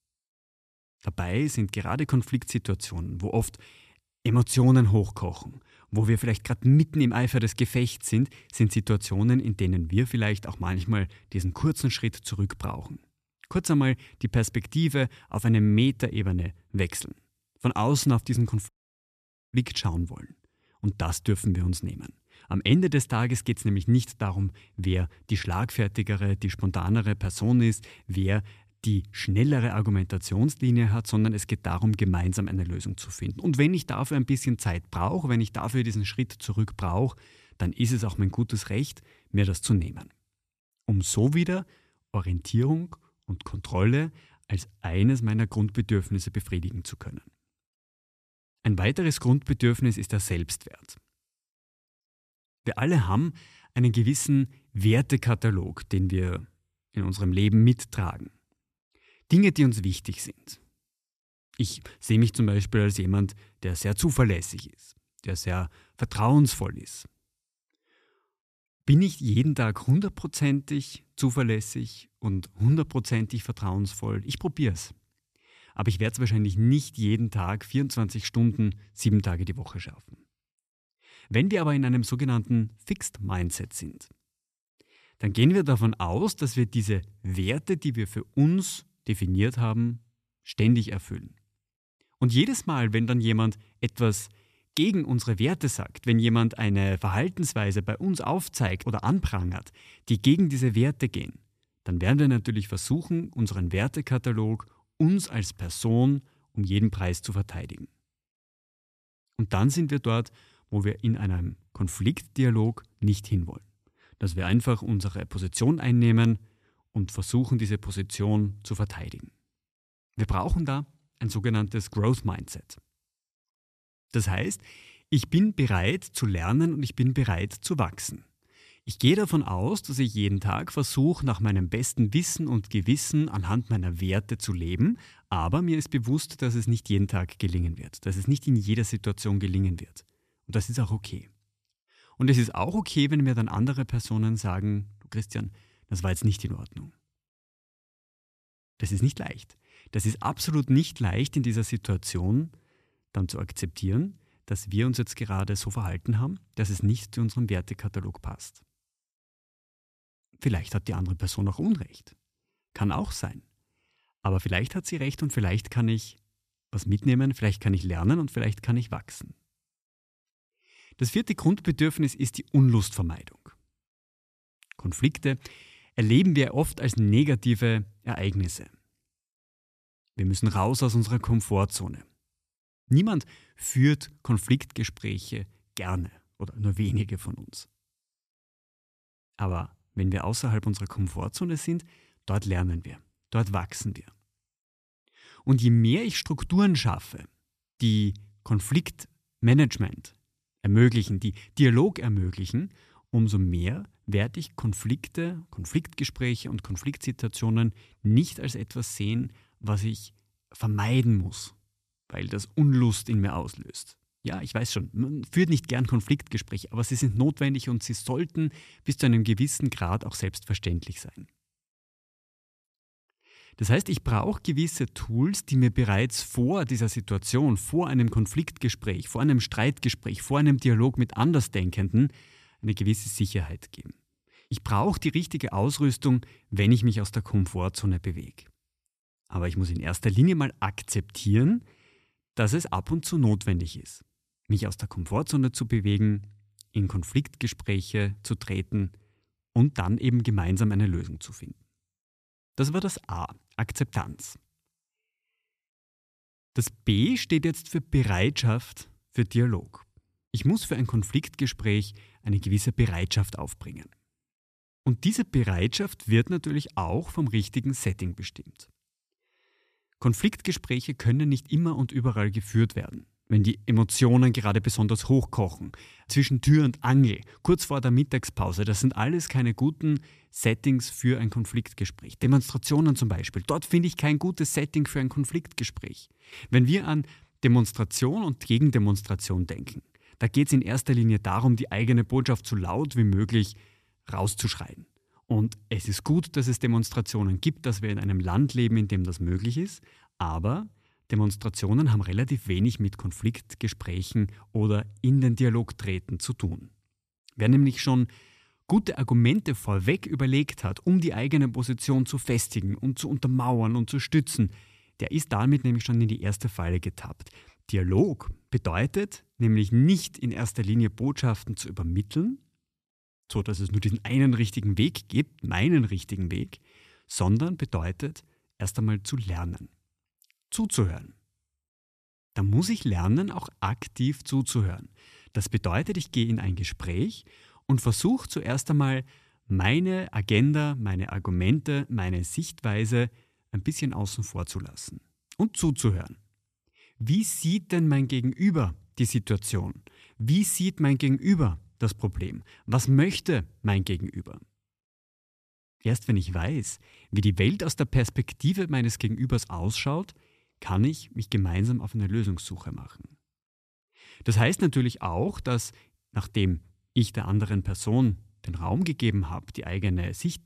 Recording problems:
audio cutting out; at 19 s for 1 s

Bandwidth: 14.5 kHz